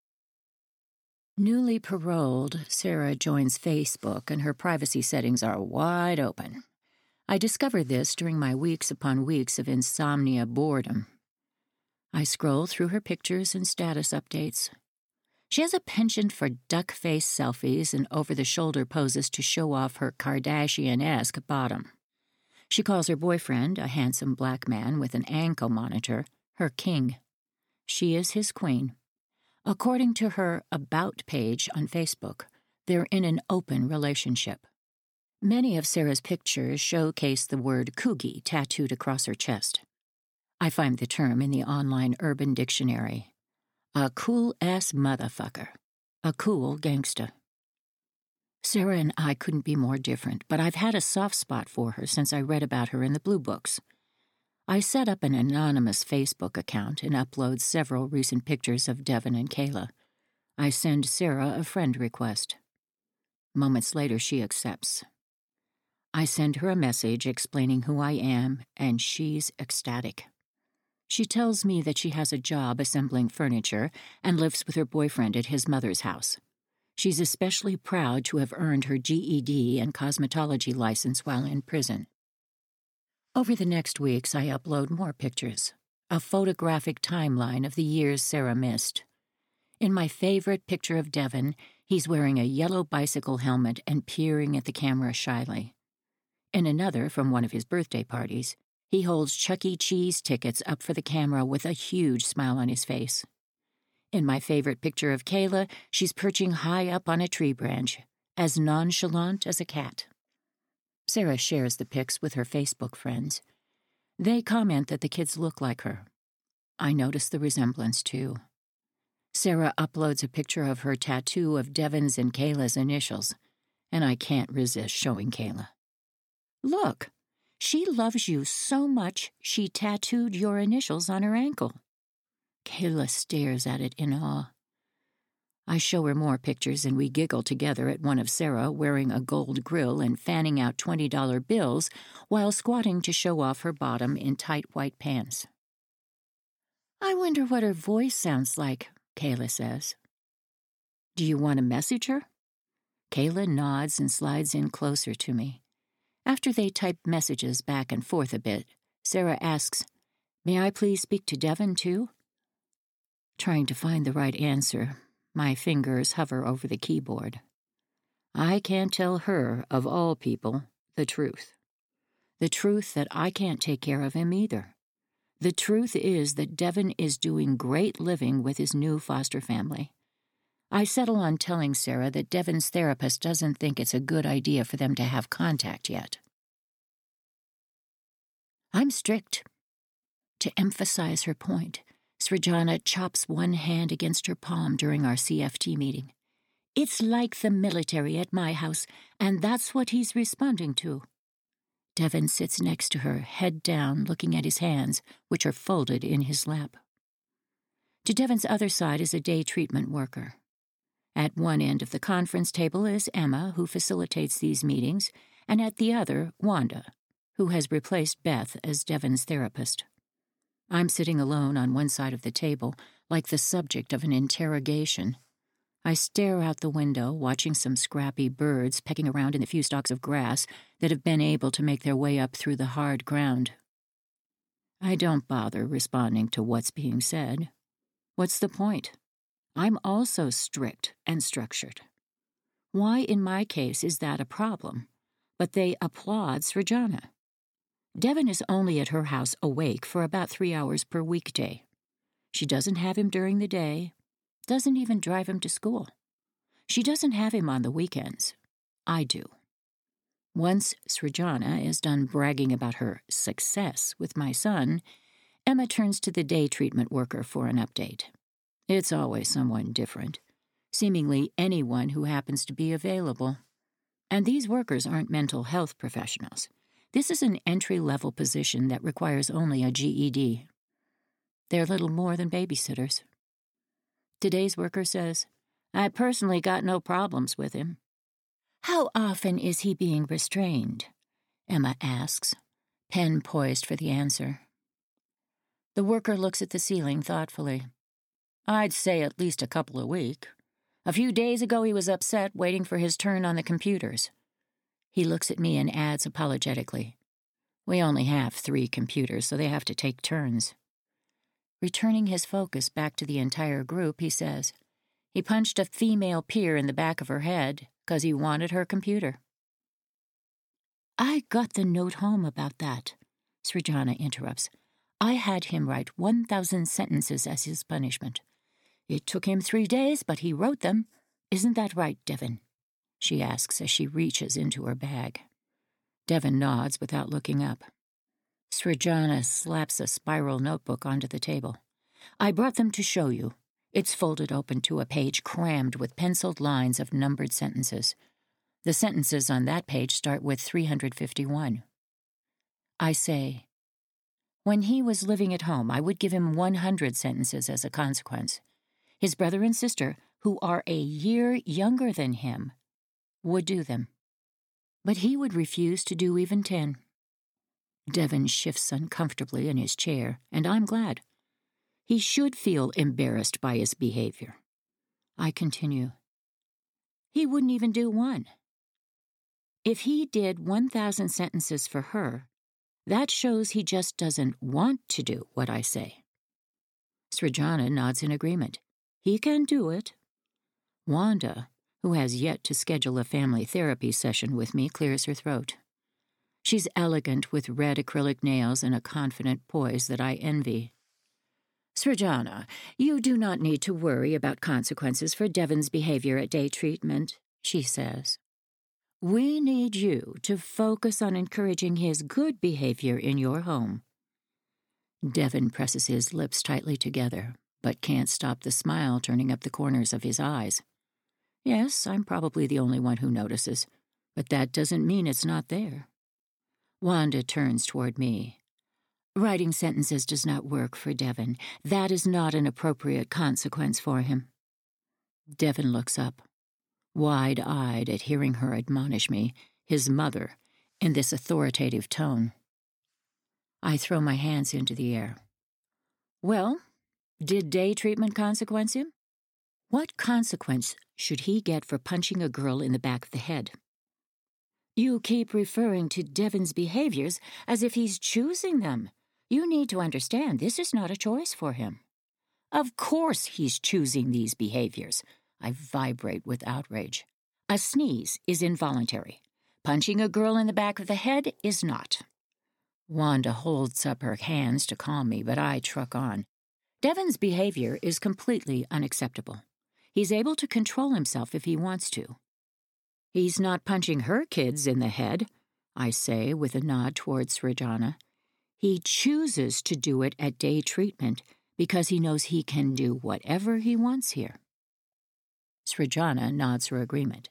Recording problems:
uneven, jittery; strongly; from 2 s to 5:40

